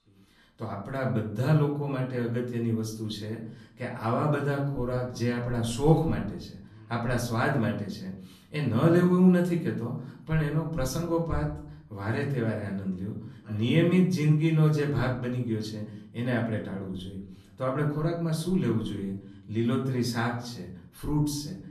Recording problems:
off-mic speech; far
room echo; slight; dies away in 0.6 s

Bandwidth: 13.5 kHz